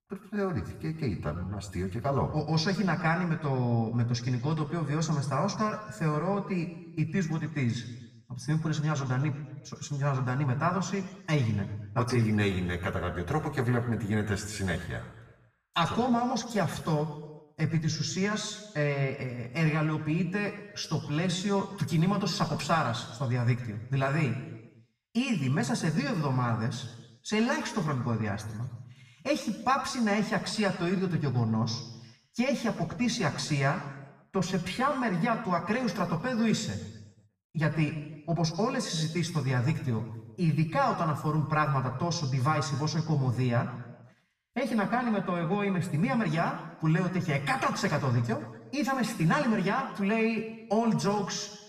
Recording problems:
off-mic speech; far
room echo; slight; dies away in 1 s

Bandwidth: 14.5 kHz